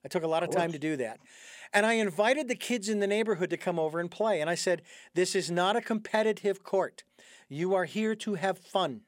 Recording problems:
none

